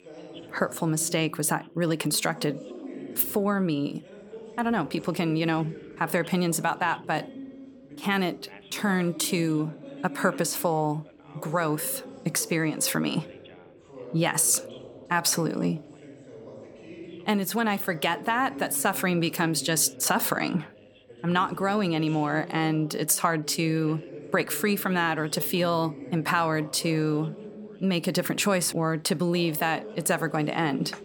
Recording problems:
background chatter; noticeable; throughout; 2 voices, 15 dB below the speech

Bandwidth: 18 kHz